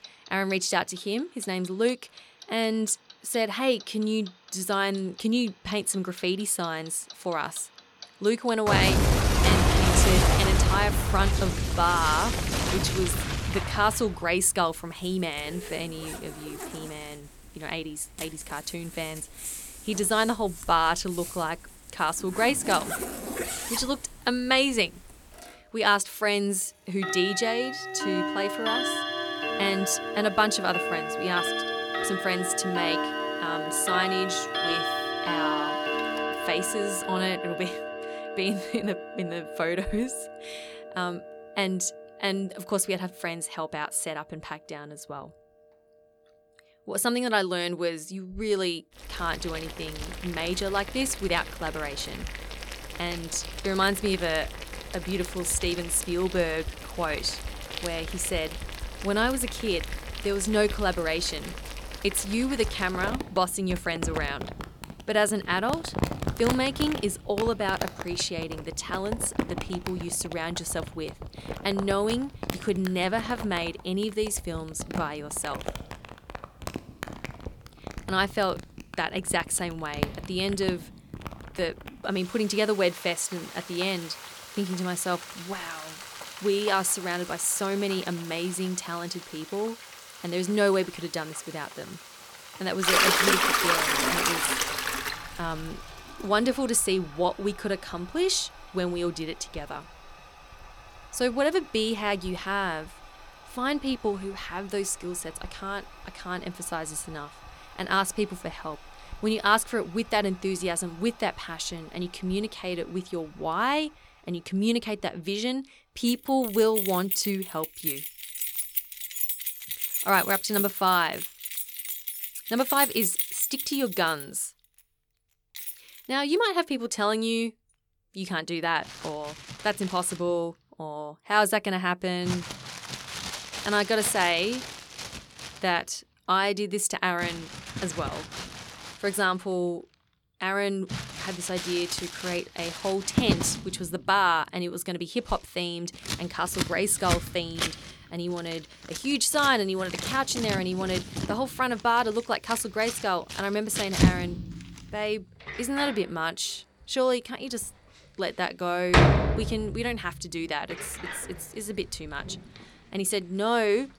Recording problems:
household noises; loud; throughout; 3 dB below the speech

